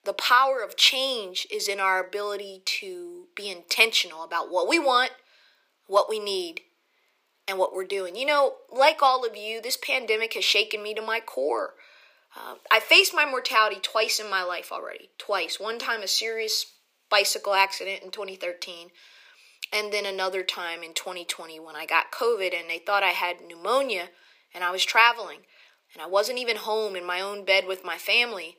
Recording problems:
thin; very; fading below 400 Hz

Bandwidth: 15 kHz